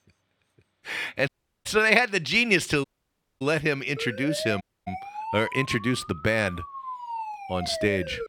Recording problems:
audio cutting out; at 1.5 s, at 3 s for 0.5 s and at 4.5 s
siren; noticeable; from 4 s on; peak 8 dB below the speech

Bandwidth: 18.5 kHz